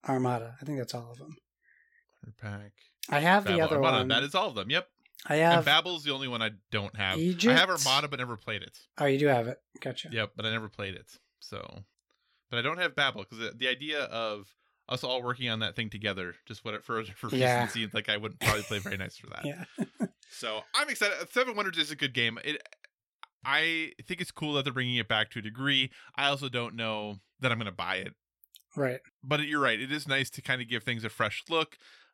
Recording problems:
none

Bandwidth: 16.5 kHz